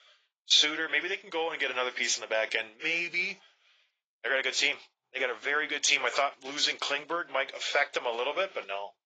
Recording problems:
garbled, watery; badly; nothing above 7.5 kHz
thin; very; fading below 550 Hz

